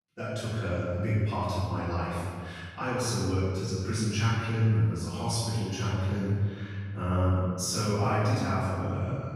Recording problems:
room echo; strong; dies away in 1.8 s
off-mic speech; far

